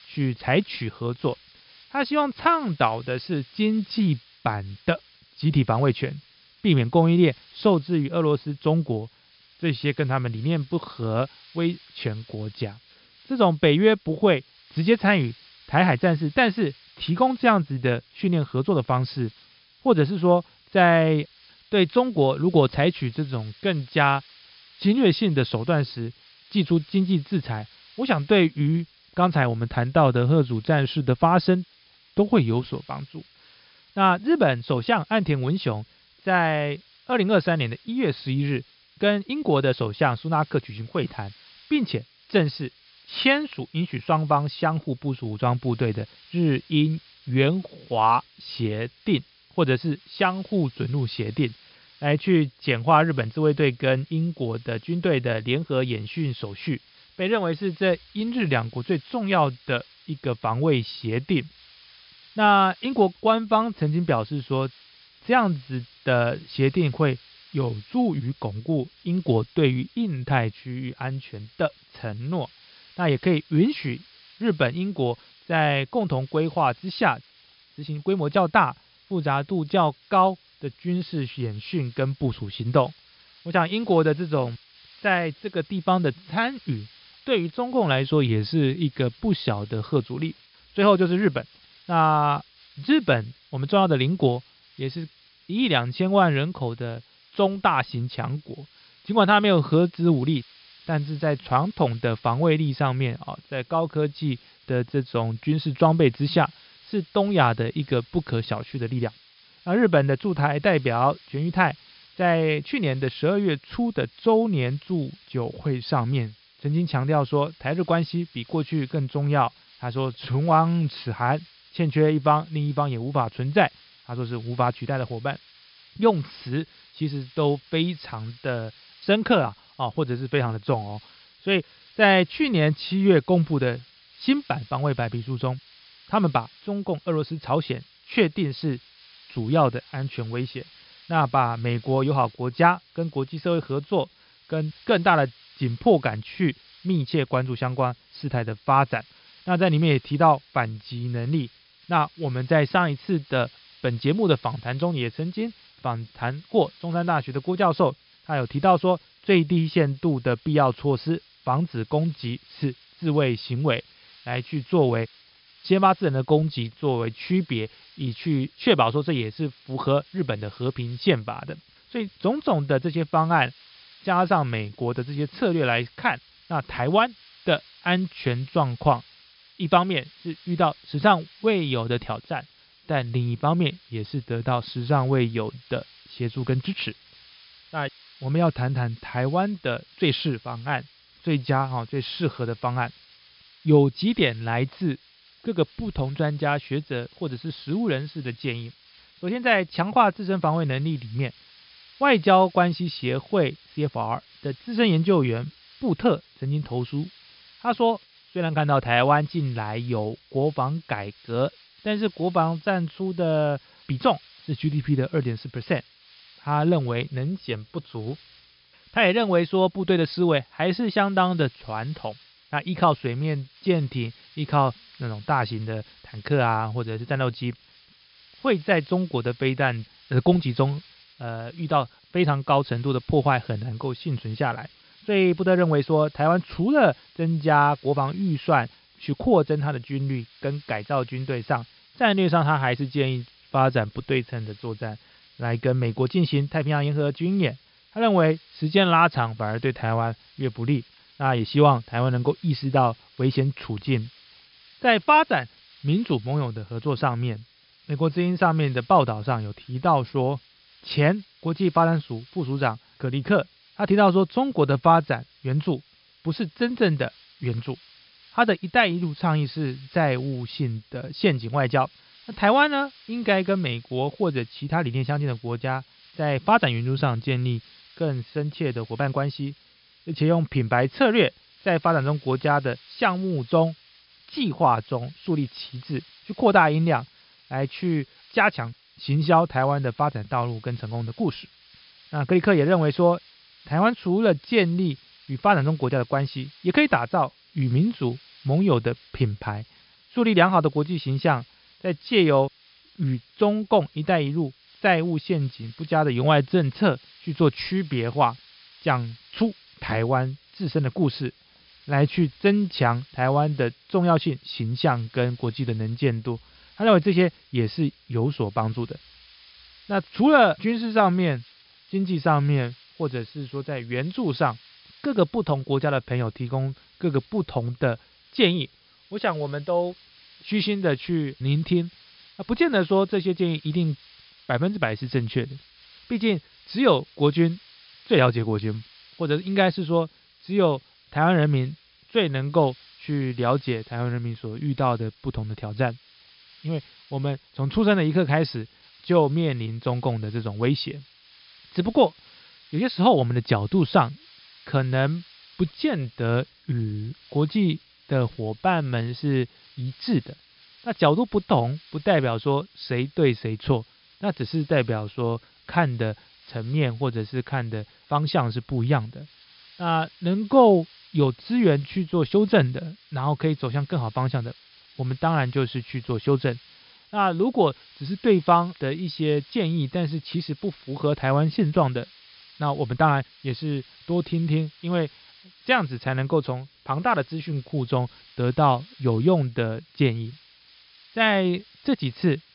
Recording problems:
high frequencies cut off; noticeable; nothing above 5.5 kHz
hiss; faint; throughout; 25 dB below the speech

